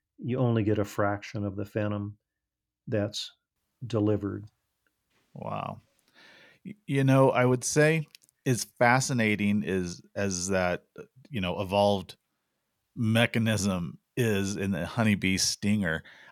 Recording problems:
none

